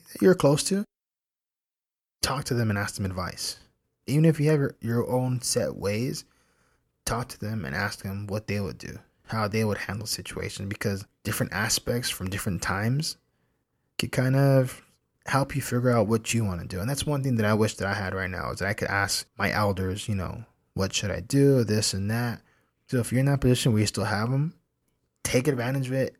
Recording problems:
none

